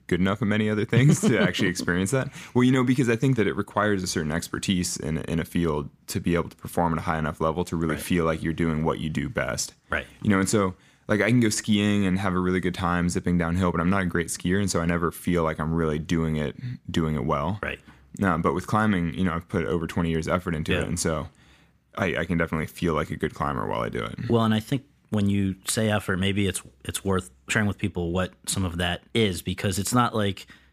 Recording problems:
none

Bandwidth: 15 kHz